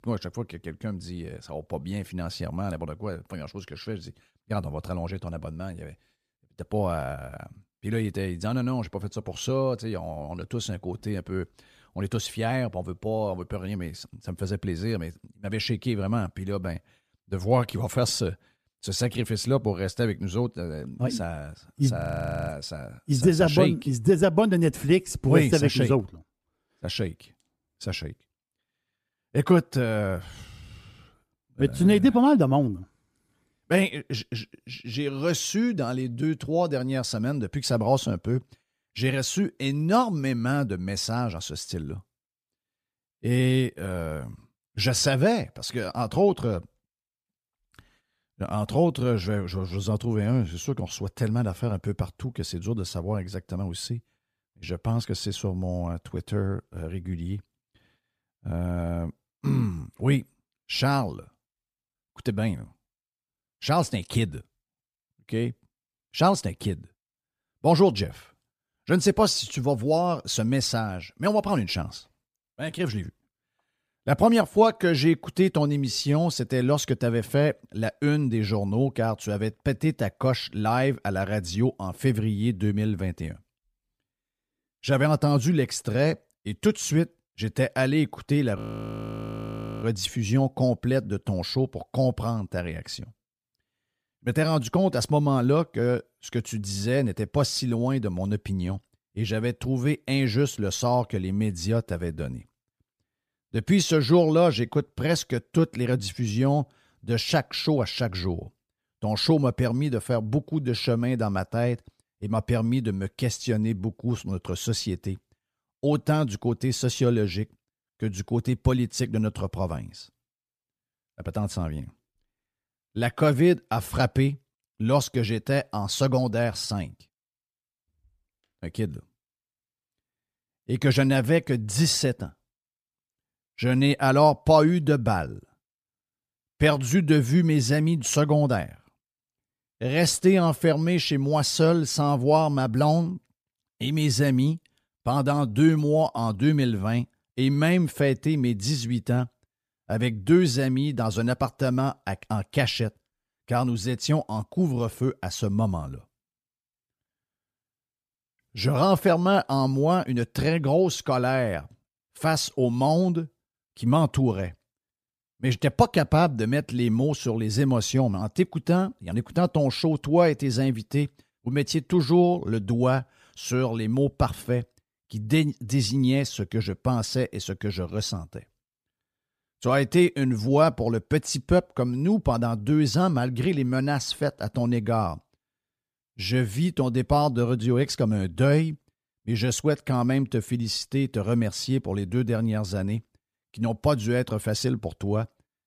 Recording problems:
audio freezing; at 22 s for 0.5 s and at 1:29 for 1.5 s

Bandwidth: 15 kHz